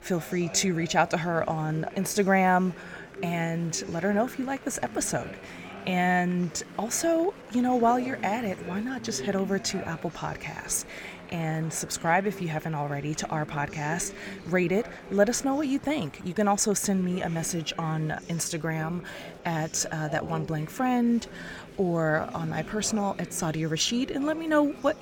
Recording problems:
murmuring crowd; noticeable; throughout; 15 dB below the speech

